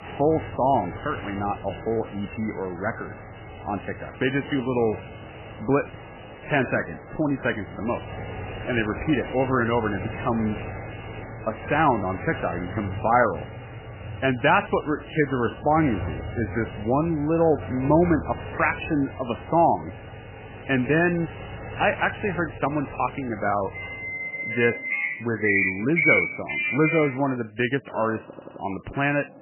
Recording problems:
garbled, watery; badly; nothing above 3 kHz
traffic noise; loud; throughout; 7 dB below the speech
audio stuttering; at 28 s

